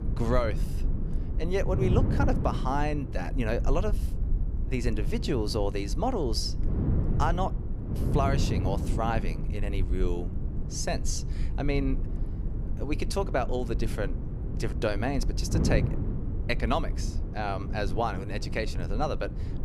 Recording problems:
wind noise on the microphone; occasional gusts; 10 dB below the speech
low rumble; faint; throughout; 20 dB below the speech

